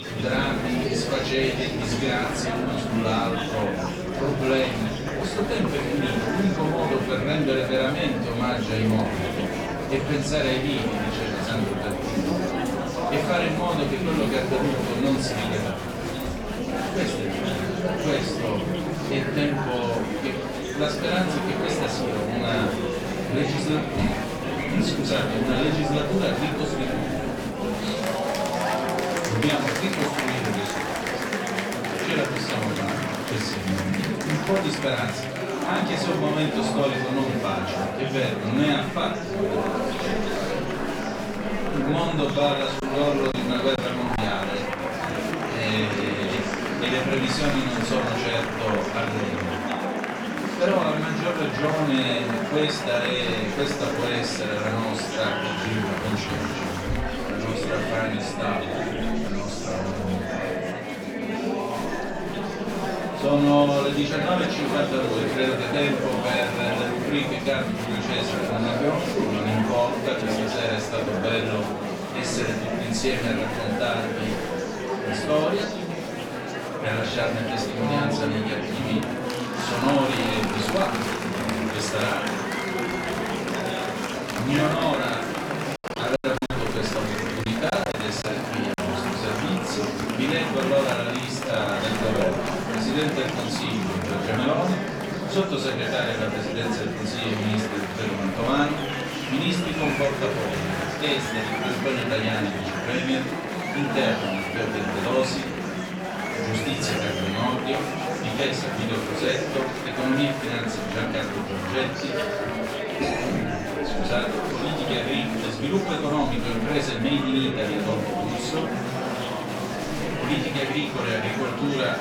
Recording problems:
off-mic speech; far
room echo; noticeable; dies away in 0.4 s
murmuring crowd; loud; throughout; 1 dB below the speech
choppy; very; from 43 to 44 s and from 1:26 to 1:29; 8% of the speech affected

